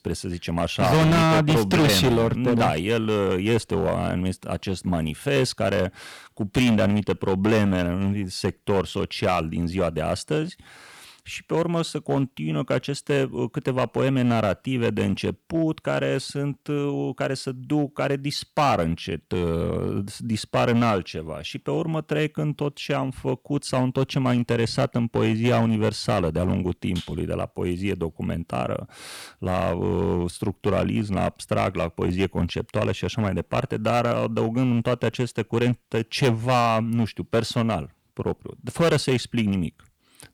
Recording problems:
distortion; heavy; 5% of the sound clipped

